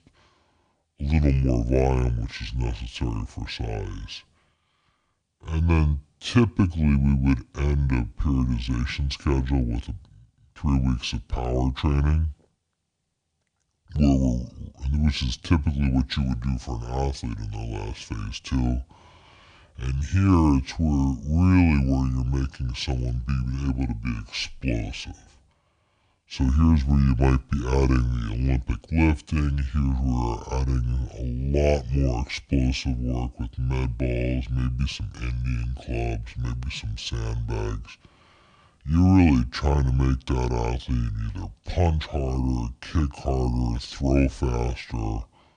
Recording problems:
wrong speed and pitch; too slow and too low; 0.7 times normal speed

